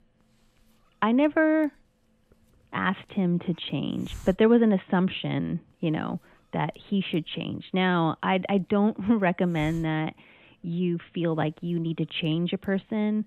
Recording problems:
high frequencies cut off; severe; nothing above 3.5 kHz
hiss; faint; throughout; 25 dB below the speech

